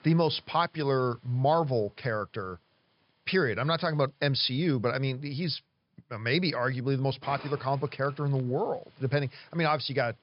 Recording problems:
high frequencies cut off; noticeable; nothing above 5.5 kHz
hiss; faint; throughout; 25 dB below the speech

